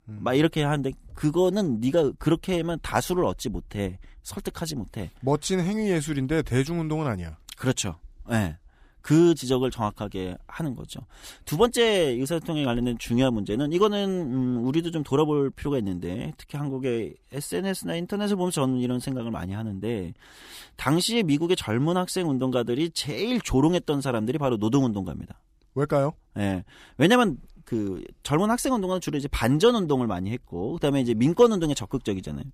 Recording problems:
none

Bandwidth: 15 kHz